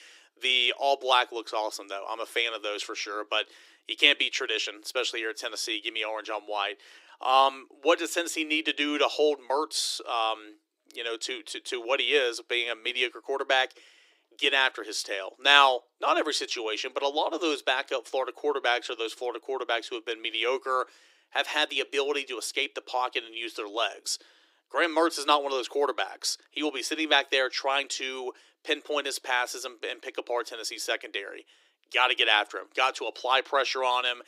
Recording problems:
thin; very; fading below 300 Hz

